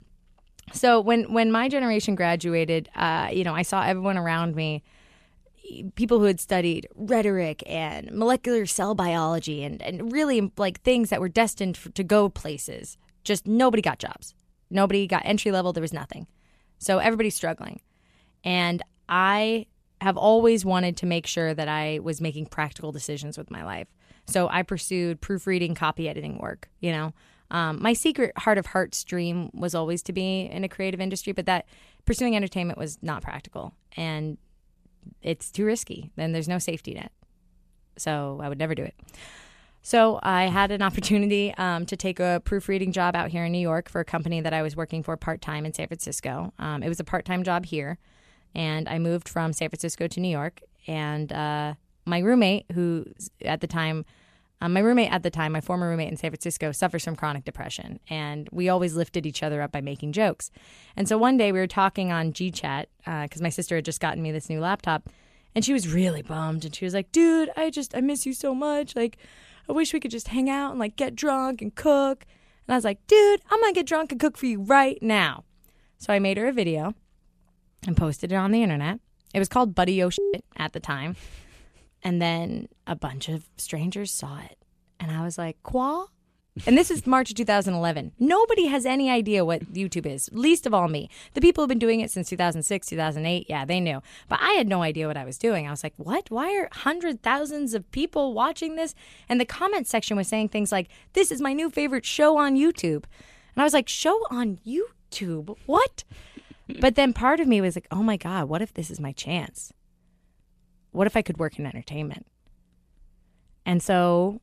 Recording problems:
none

